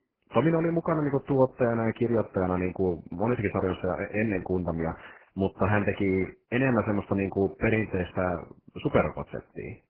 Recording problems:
garbled, watery; badly

